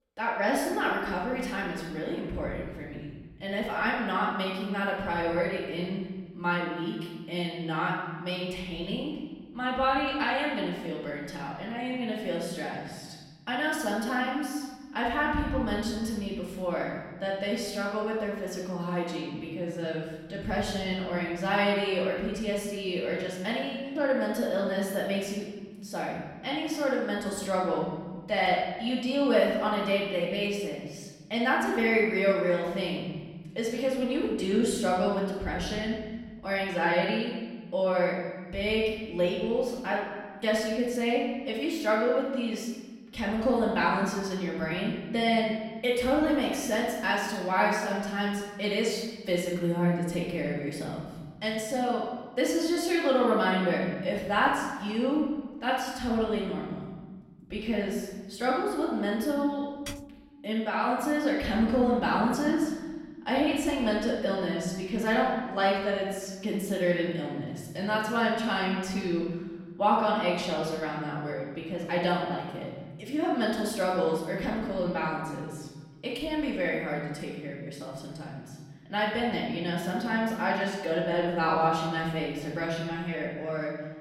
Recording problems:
off-mic speech; far
room echo; noticeable; dies away in 1.5 s
keyboard typing; faint; at 1:00; peak 15 dB below the speech

